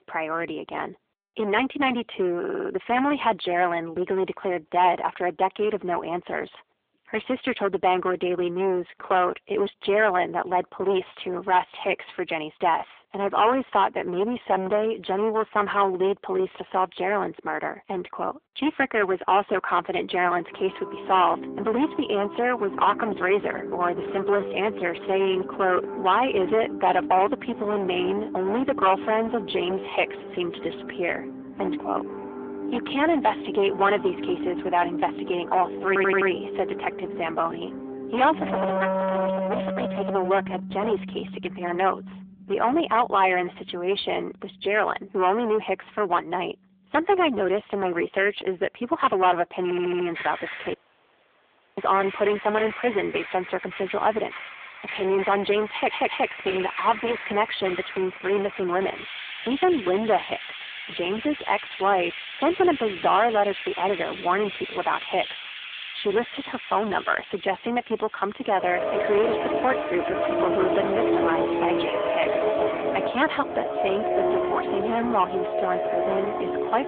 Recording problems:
distortion; heavy; 10% of the sound clipped
phone-call audio
background music; loud; from 20 s on; 6 dB below the speech
audio stuttering; 4 times, first at 2.5 s
audio cutting out; at 51 s for 1 s

